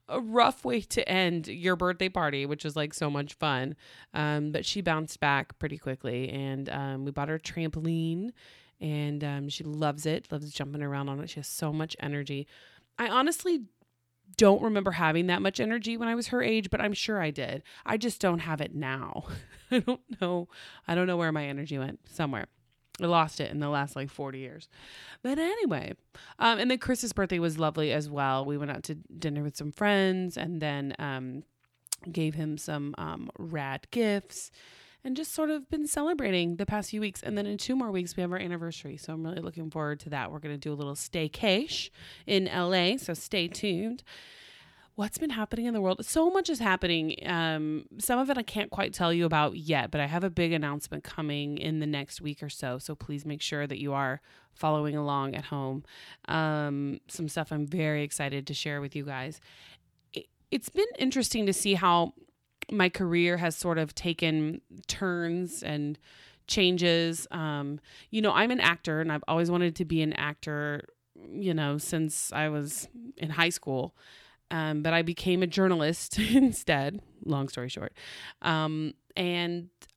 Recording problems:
none

